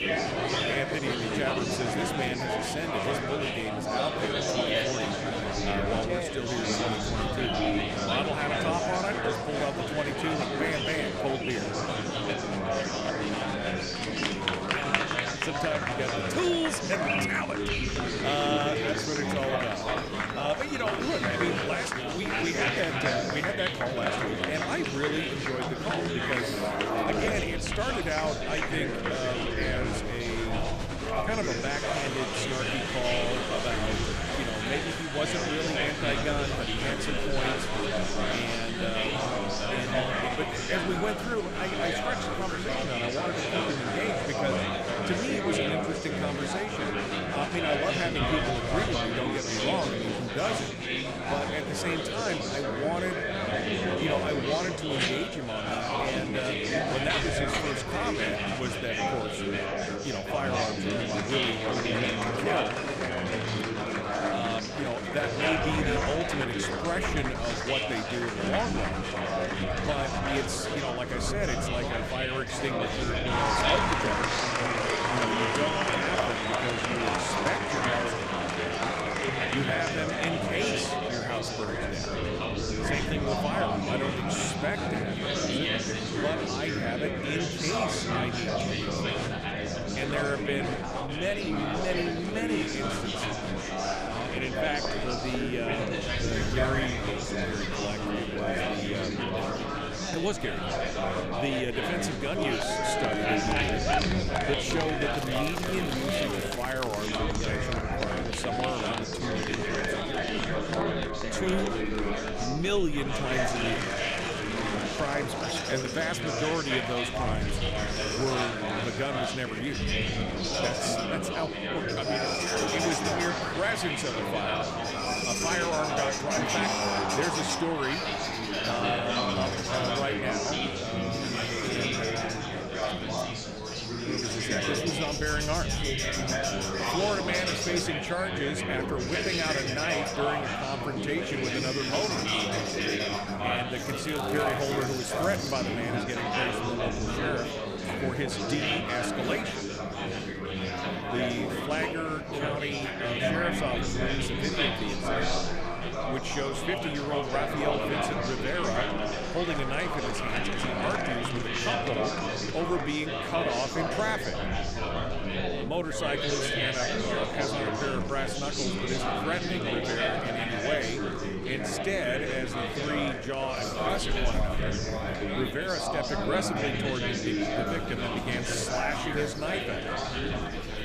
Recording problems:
chatter from many people; very loud; throughout; 3 dB above the speech
animal sounds; loud; throughout; 7 dB below the speech
wind noise on the microphone; occasional gusts; 25 dB below the speech
crackling; noticeable; from 1:45 to 1:47 and from 2:24 to 2:26; 15 dB below the speech

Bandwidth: 14.5 kHz